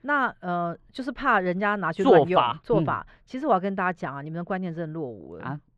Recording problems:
muffled; slightly; fading above 2.5 kHz

